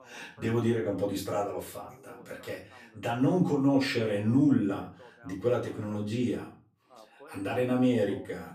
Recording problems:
off-mic speech; far
room echo; slight; dies away in 0.4 s
voice in the background; faint; throughout; 25 dB below the speech

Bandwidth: 15 kHz